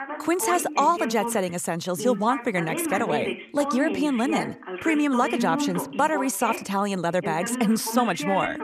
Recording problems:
voice in the background; loud; throughout; 6 dB below the speech

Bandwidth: 14.5 kHz